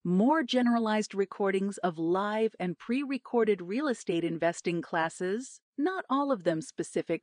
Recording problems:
garbled, watery; slightly; nothing above 9 kHz

